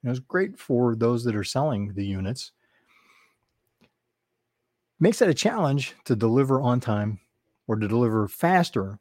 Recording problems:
none

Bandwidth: 16 kHz